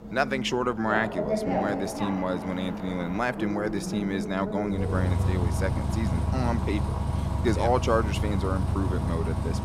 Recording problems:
traffic noise; loud; throughout; as loud as the speech

